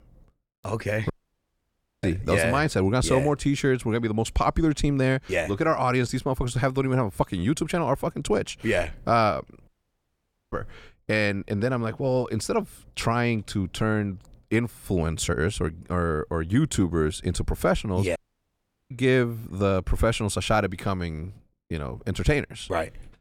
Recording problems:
audio cutting out; at 1 s for 1 s, at 9.5 s for 1 s and at 18 s for 0.5 s

